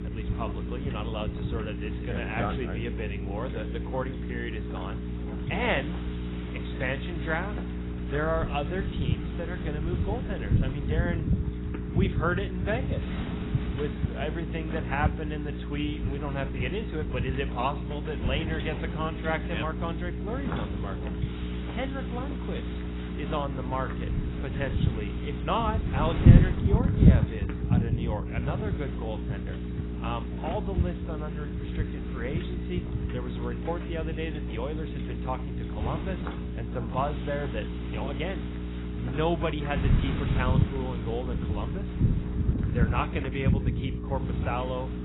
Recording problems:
garbled, watery; badly; nothing above 3.5 kHz
wind noise on the microphone; heavy; 7 dB below the speech
electrical hum; loud; throughout; 60 Hz, 9 dB below the speech
rain or running water; faint; throughout; 25 dB below the speech

